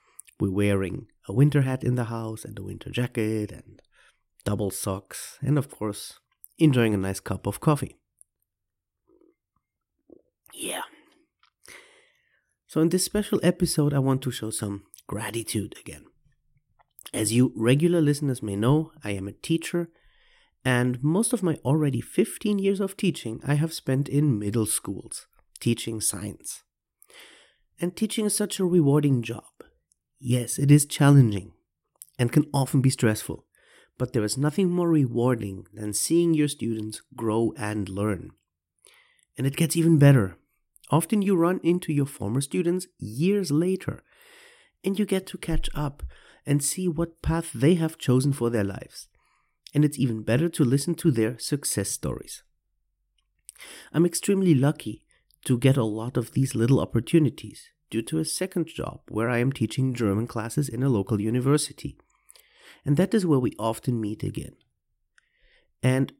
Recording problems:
none

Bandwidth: 16 kHz